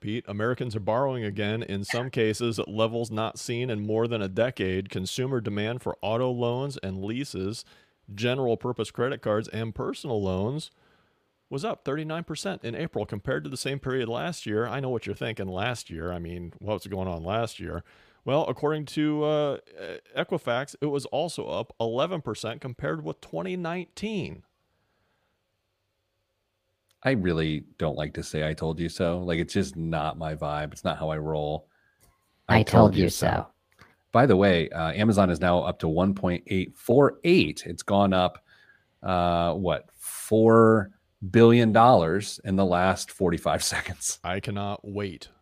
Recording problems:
none

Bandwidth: 15 kHz